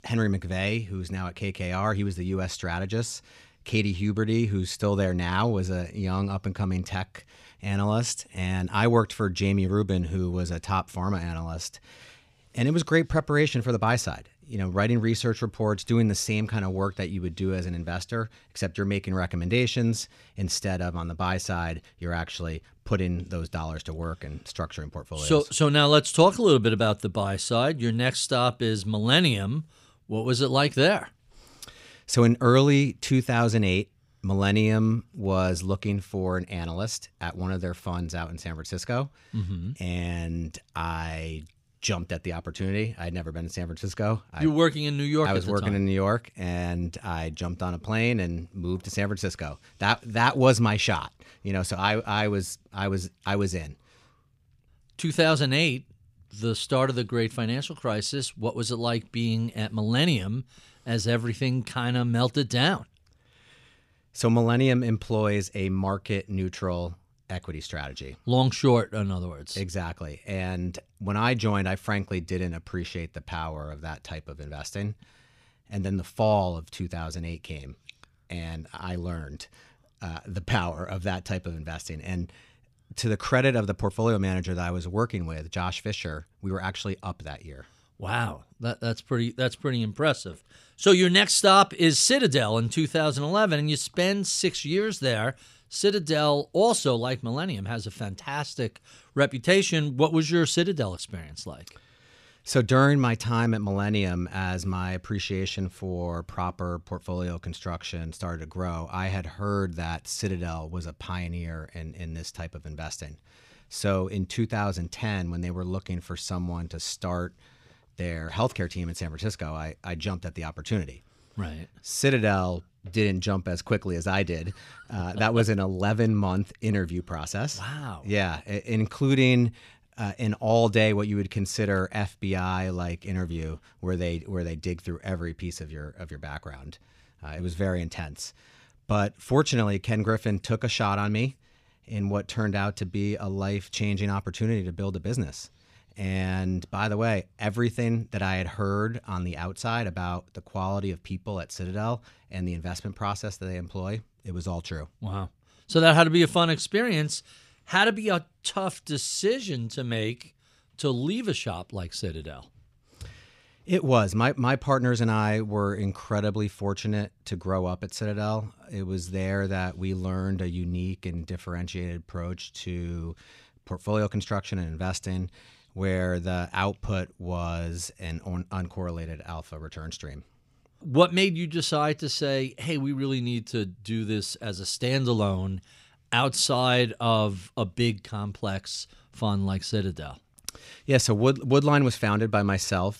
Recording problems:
none

